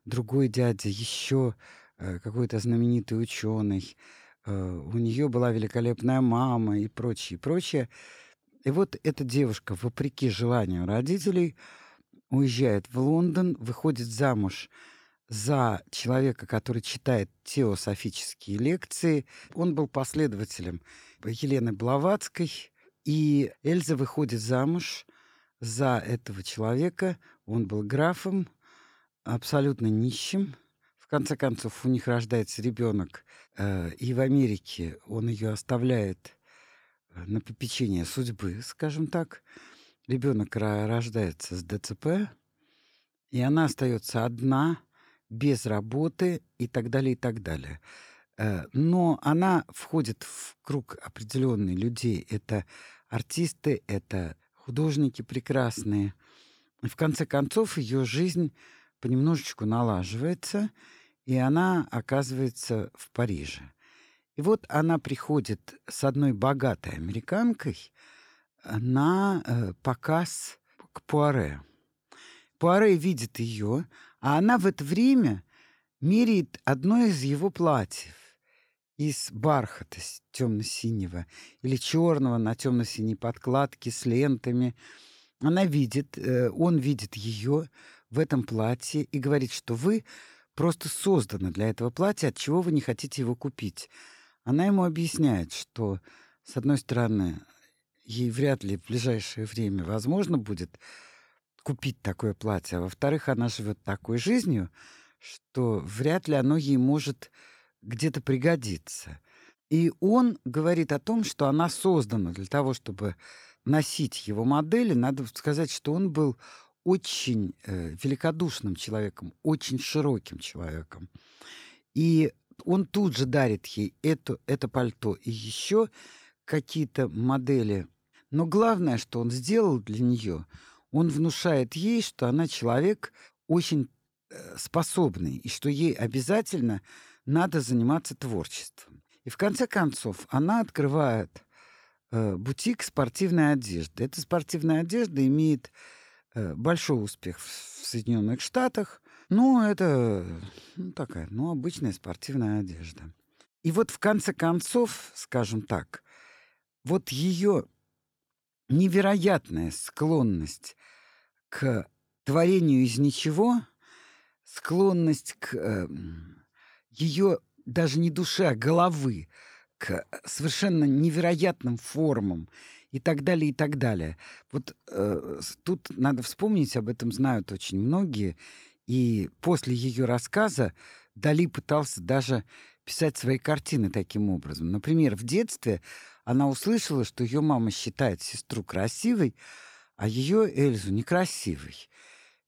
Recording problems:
none

